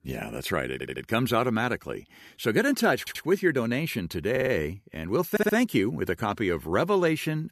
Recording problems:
audio stuttering; 4 times, first at 0.5 s

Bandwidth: 14 kHz